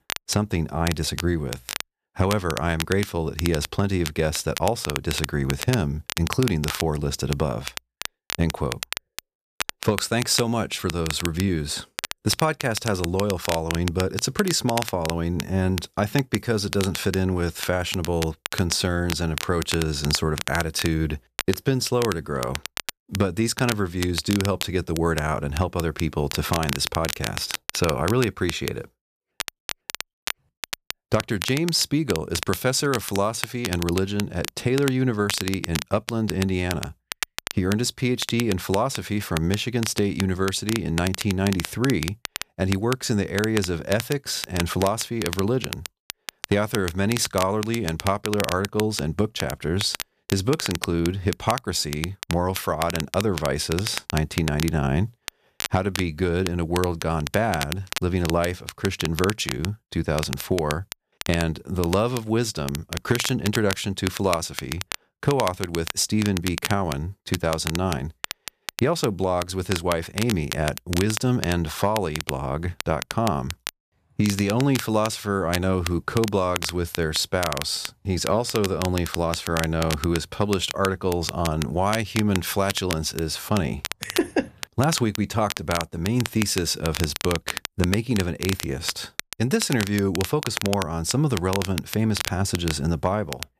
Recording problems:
crackle, like an old record; loud; 8 dB below the speech

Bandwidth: 14.5 kHz